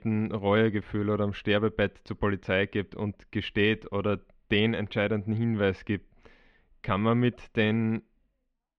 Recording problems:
muffled; very; fading above 3 kHz

